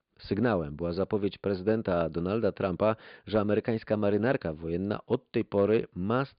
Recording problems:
high frequencies cut off; severe; nothing above 4.5 kHz

